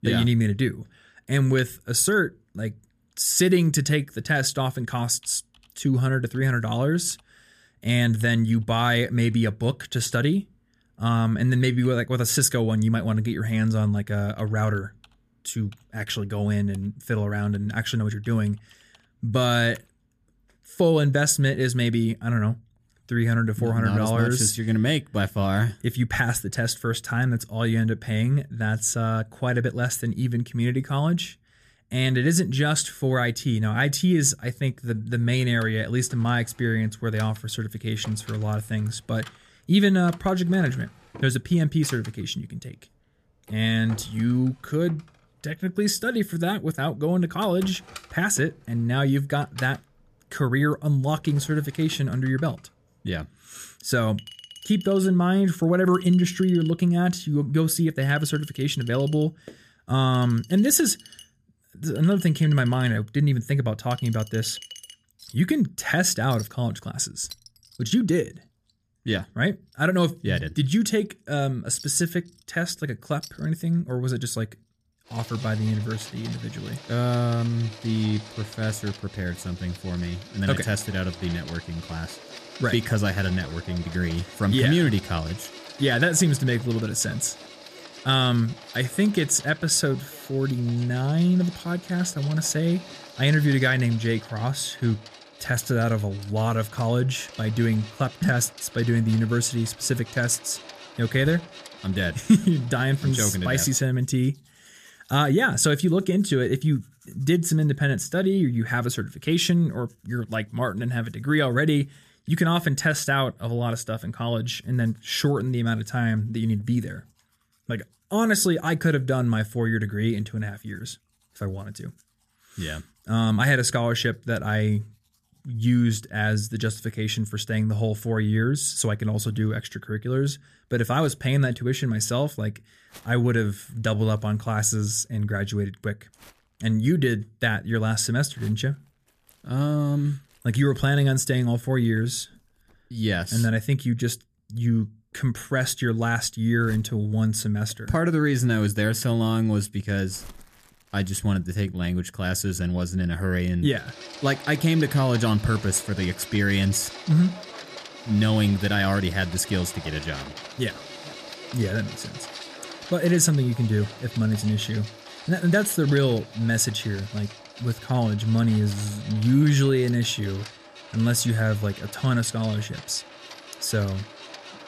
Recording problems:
household noises; noticeable; throughout; 20 dB below the speech

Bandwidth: 14.5 kHz